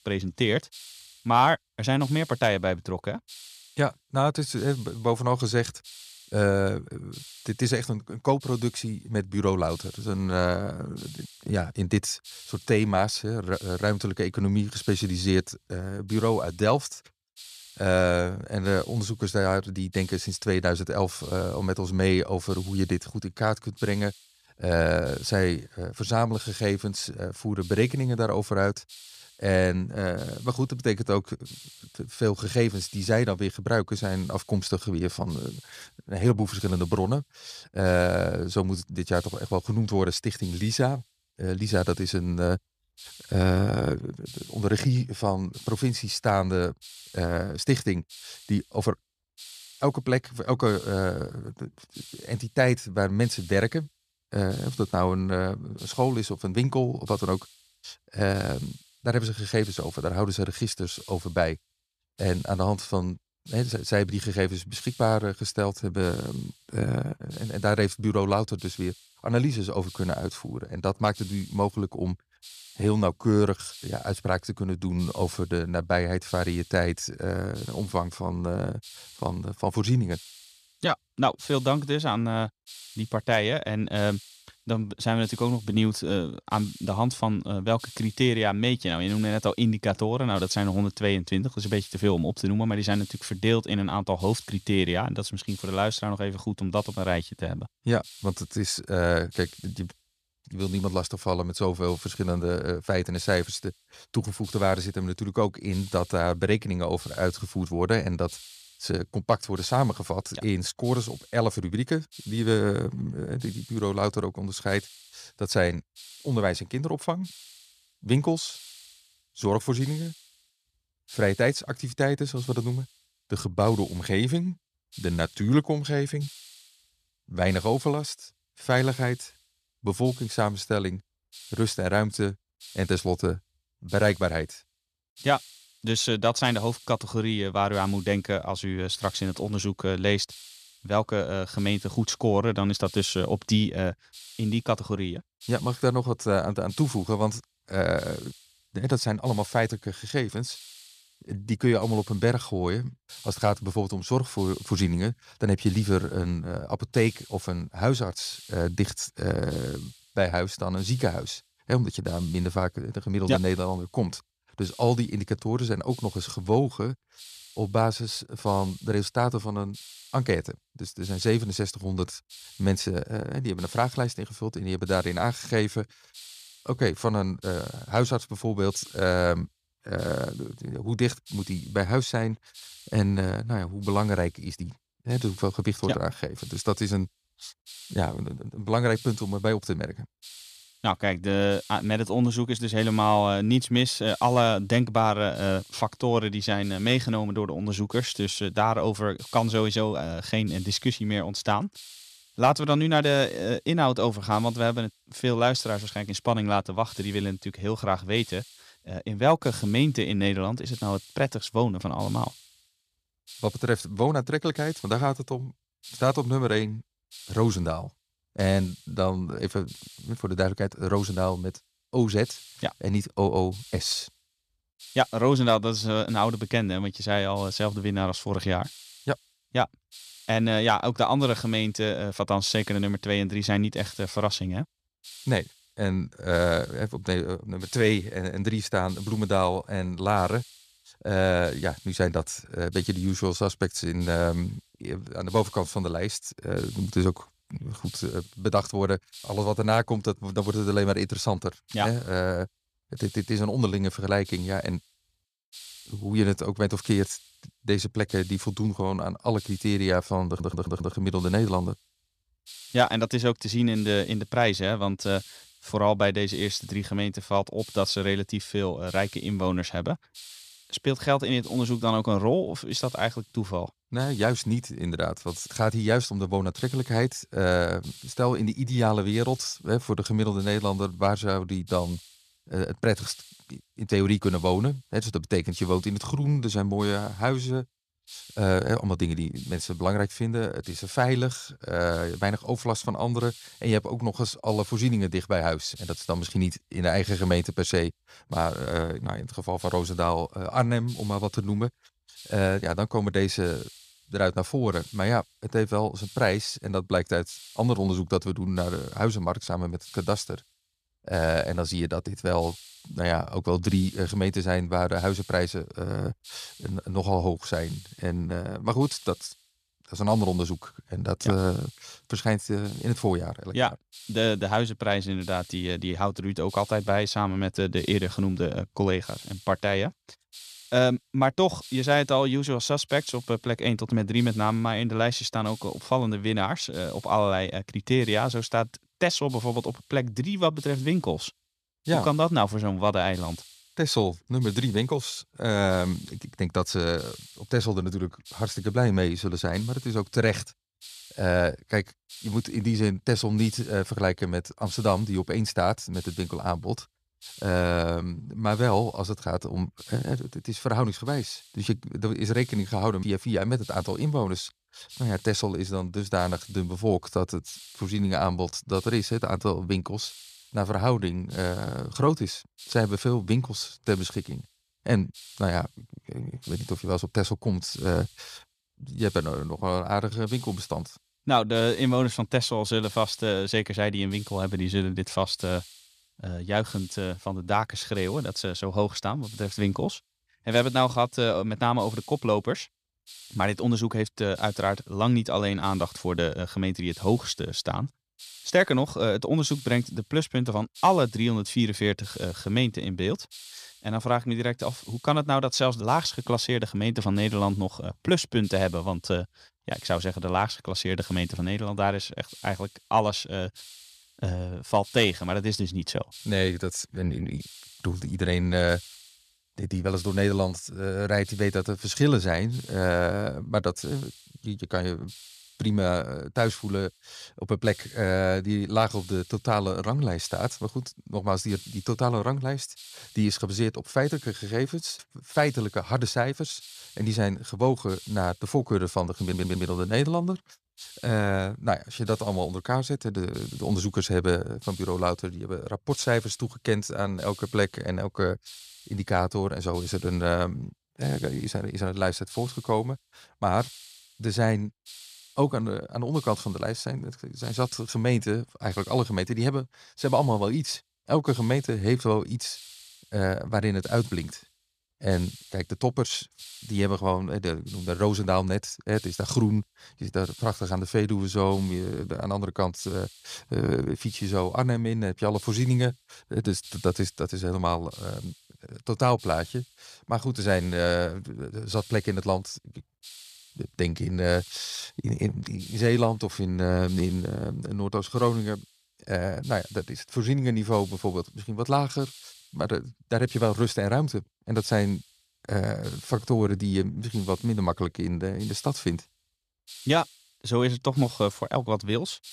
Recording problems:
hiss; noticeable; throughout; 20 dB below the speech
uneven, jittery; slightly; from 1:01 to 8:17
audio stuttering; at 4:20 and at 7:19

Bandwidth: 15 kHz